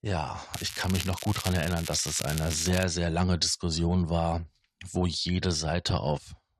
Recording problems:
crackling; loud; from 0.5 to 3 s; 9 dB below the speech

